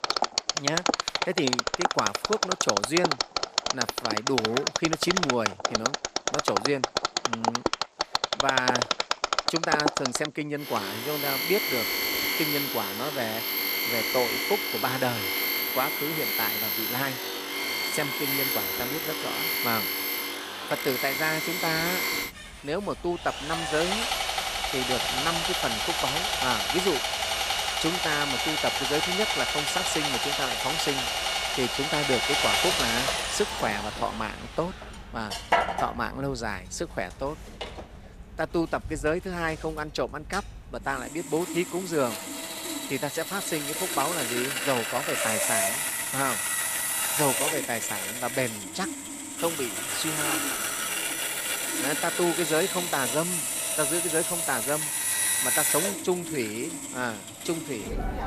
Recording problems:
machinery noise; very loud; throughout; 4 dB above the speech

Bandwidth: 14.5 kHz